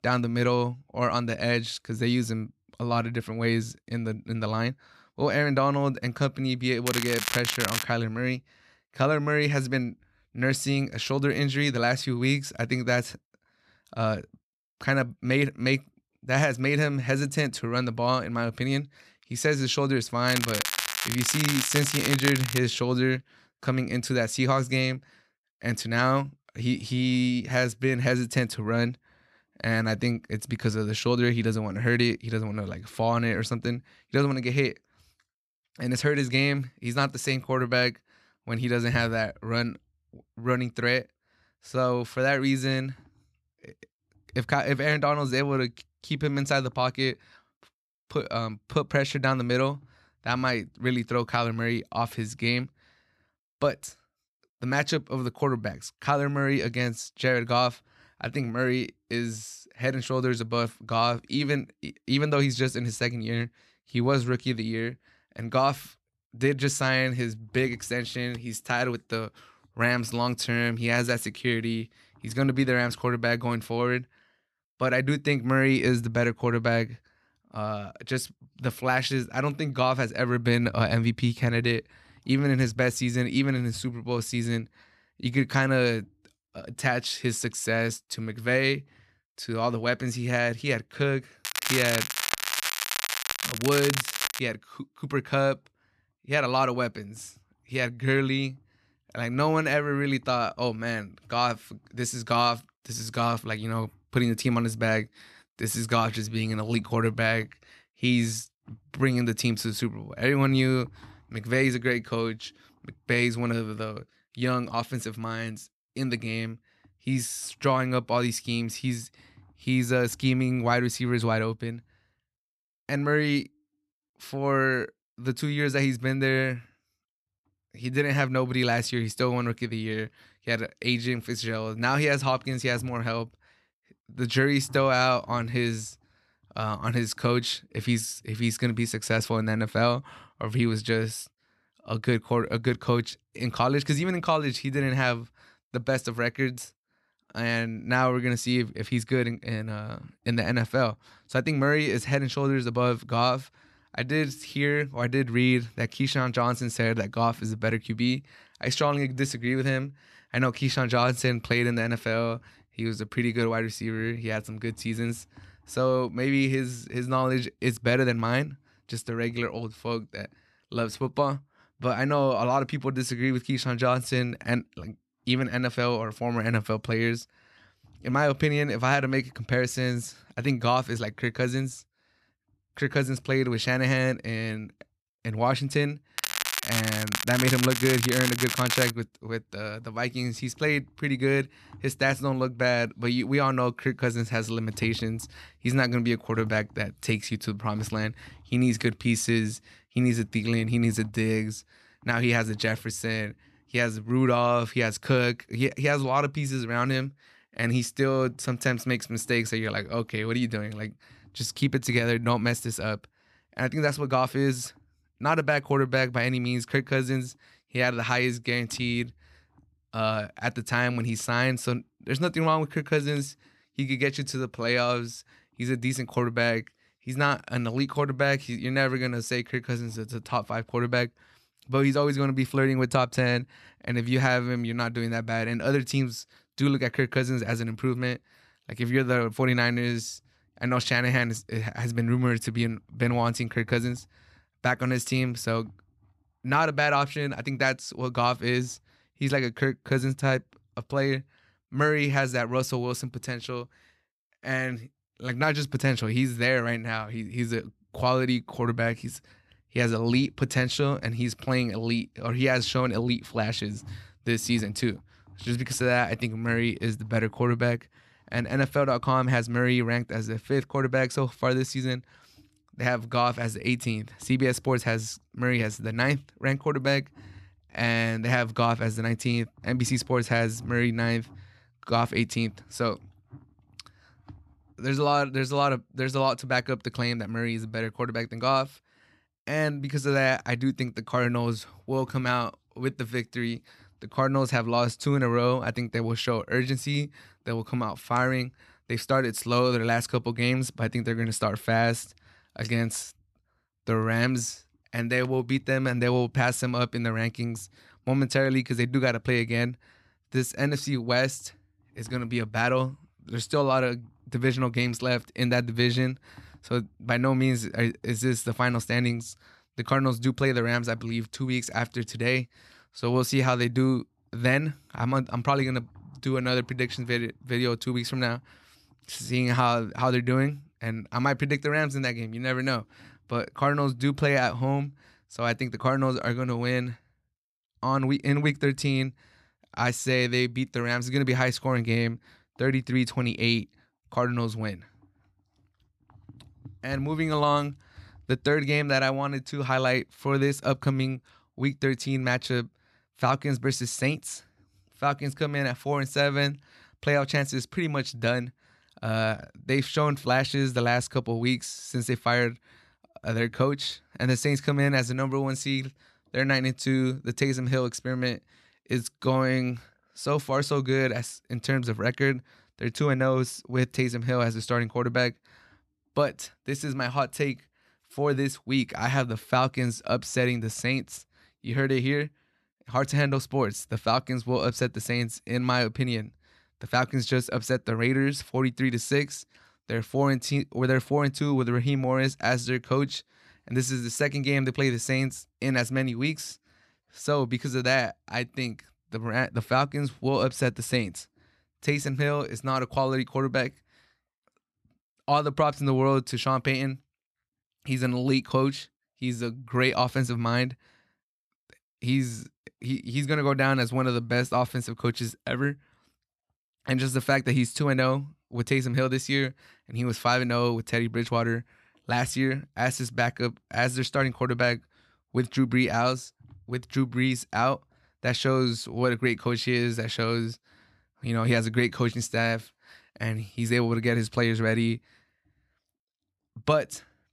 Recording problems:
crackling; loud; 4 times, first at 7 s; 2 dB below the speech

